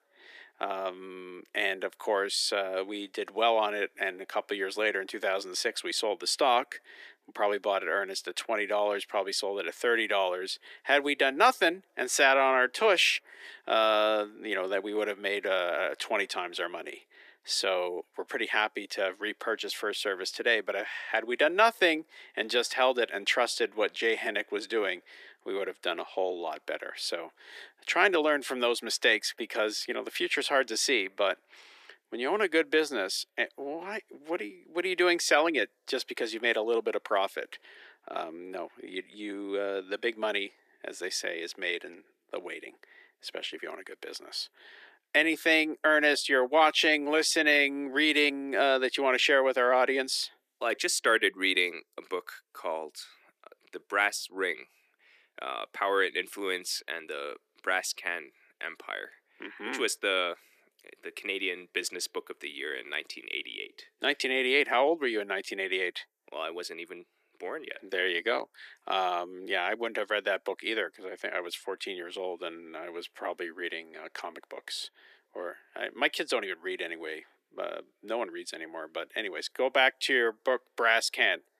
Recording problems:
thin; very; fading below 350 Hz

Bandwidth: 14.5 kHz